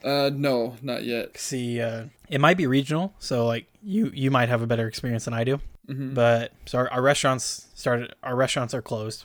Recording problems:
none

